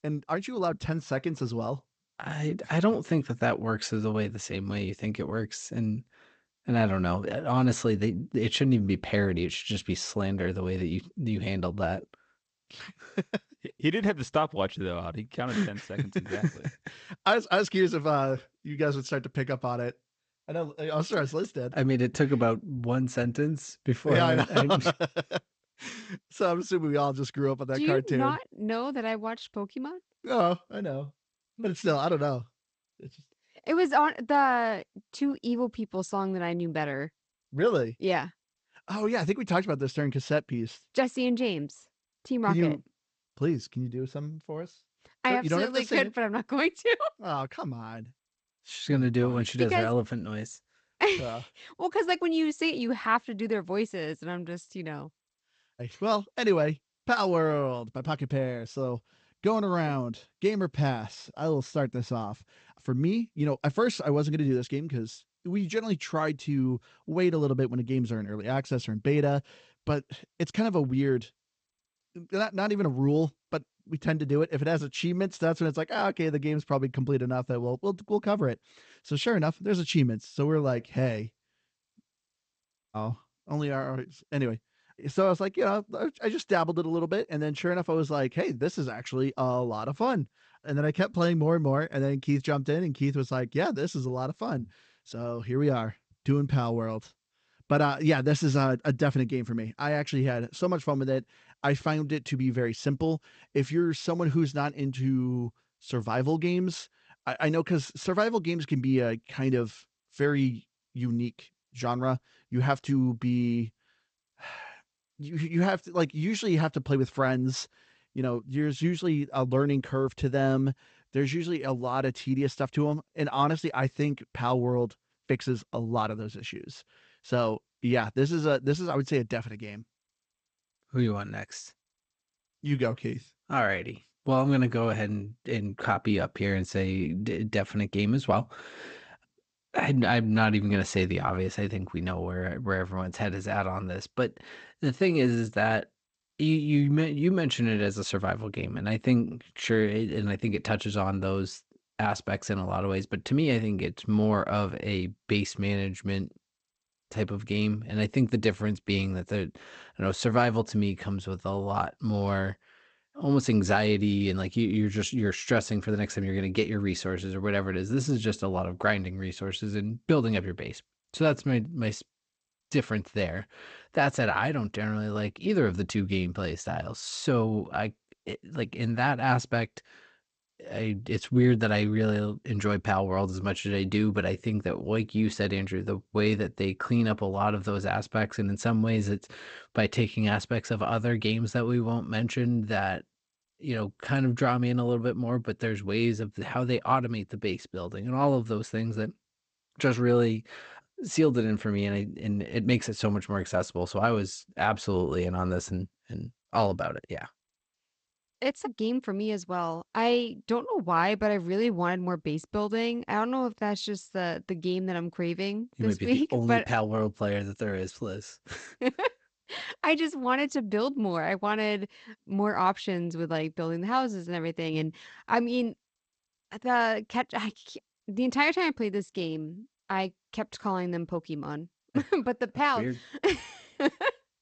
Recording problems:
garbled, watery; slightly; nothing above 8 kHz

